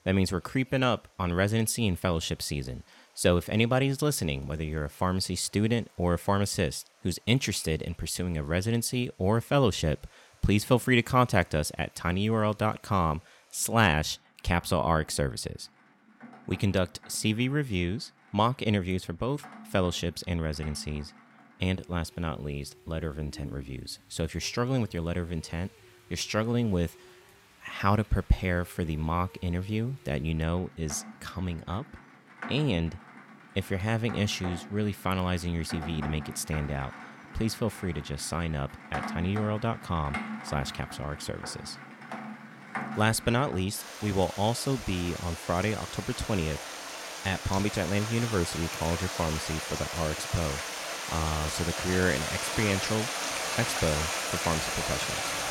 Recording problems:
rain or running water; loud; throughout; 6 dB below the speech

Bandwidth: 16.5 kHz